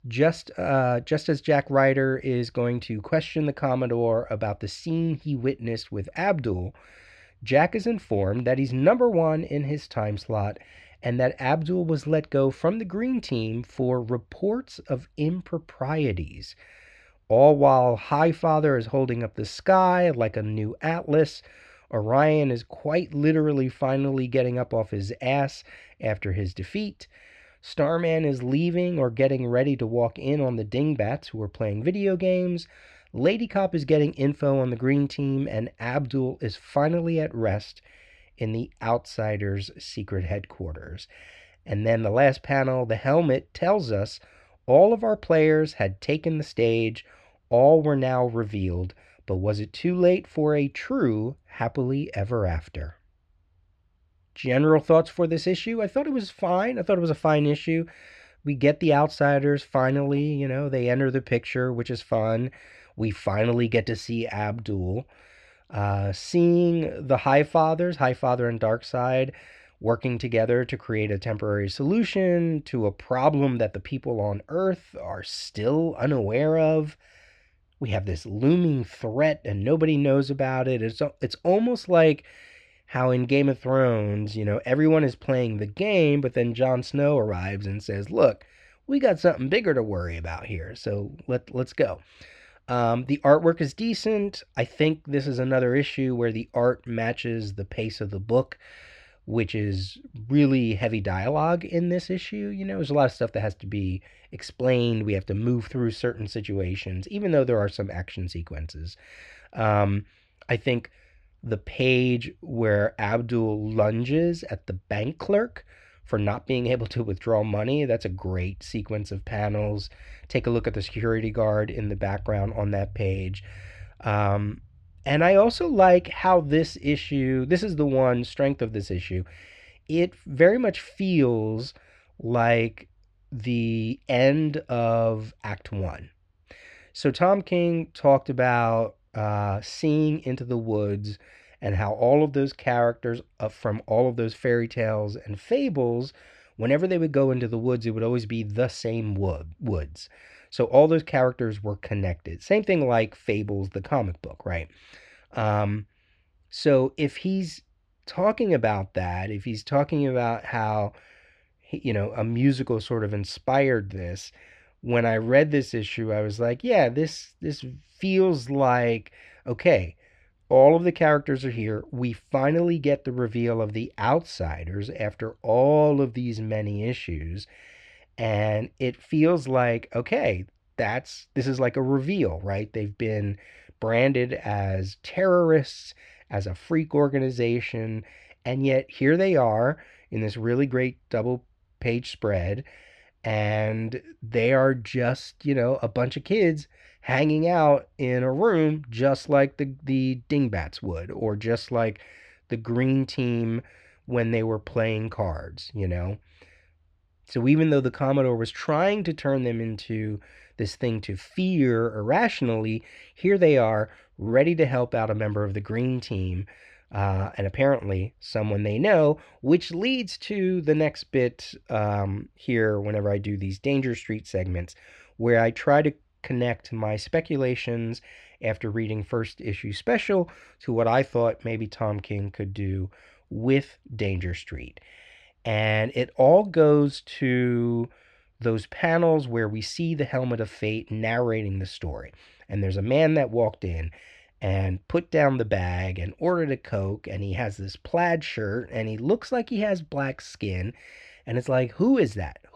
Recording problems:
muffled; very slightly; fading above 3 kHz

